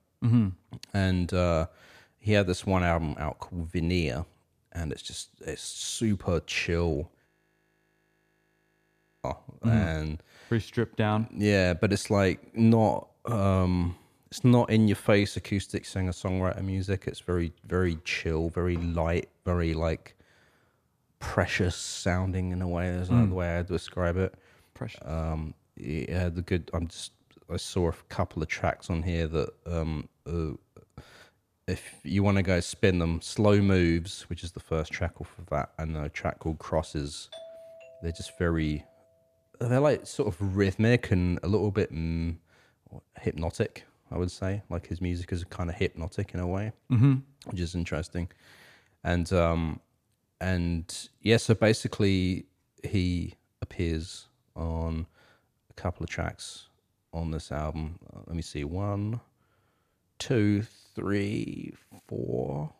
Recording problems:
audio freezing; at 7.5 s for 2 s
doorbell; faint; from 37 to 39 s; peak 15 dB below the speech

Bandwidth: 14.5 kHz